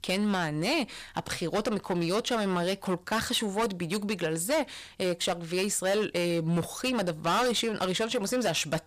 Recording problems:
distortion; heavy; 13% of the sound clipped

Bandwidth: 15 kHz